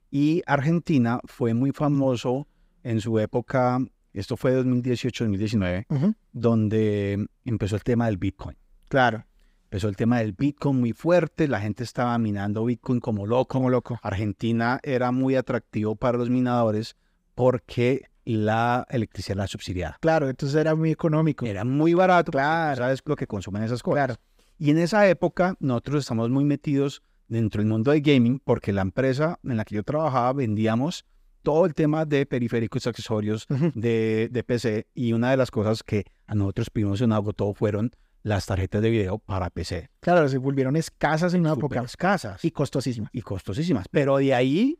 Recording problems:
none

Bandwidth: 15.5 kHz